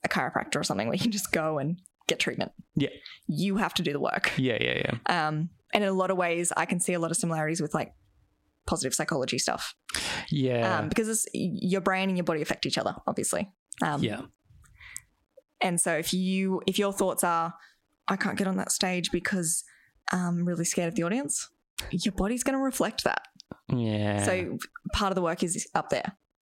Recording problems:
squashed, flat; heavily

